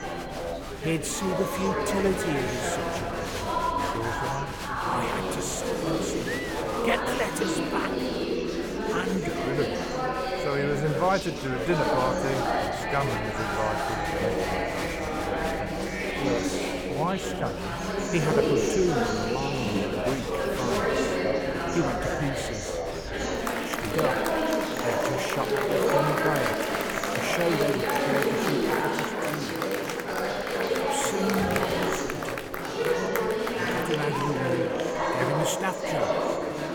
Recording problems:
chatter from many people; very loud; throughout; 4 dB above the speech

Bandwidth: 18.5 kHz